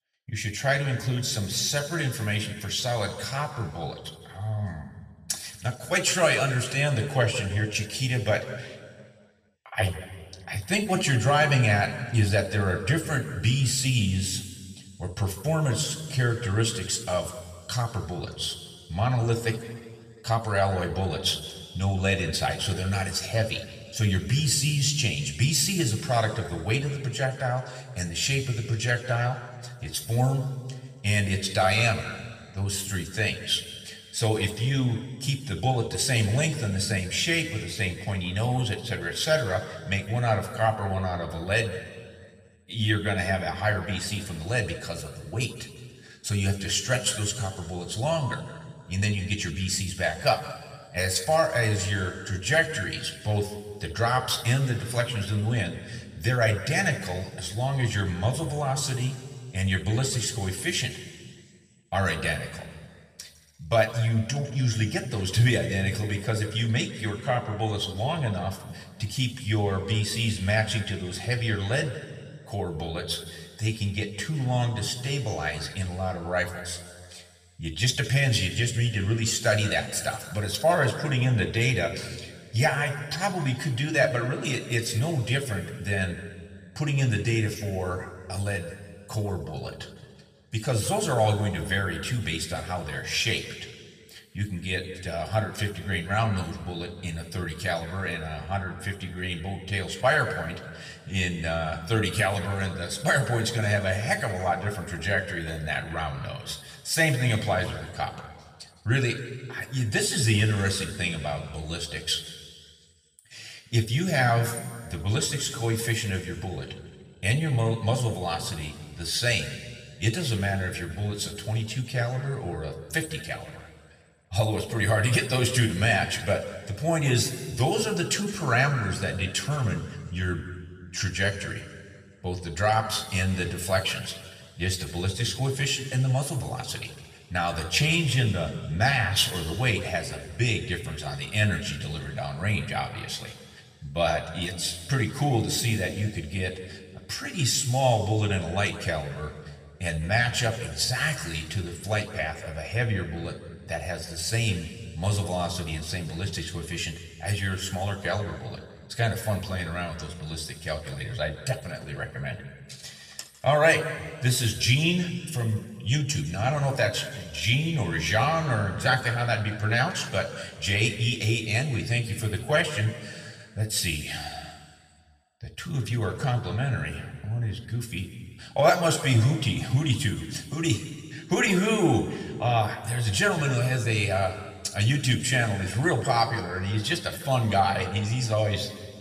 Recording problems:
room echo; slight; dies away in 1.7 s
off-mic speech; somewhat distant

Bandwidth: 14.5 kHz